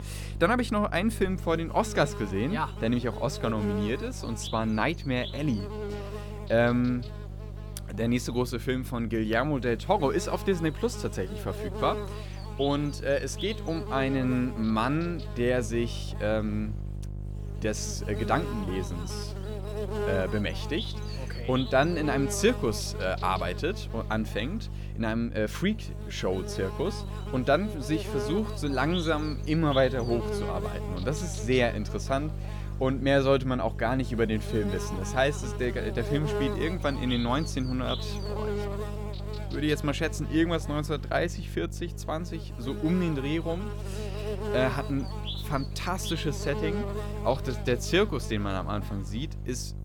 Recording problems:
electrical hum; loud; throughout; 50 Hz, 10 dB below the speech

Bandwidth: 18.5 kHz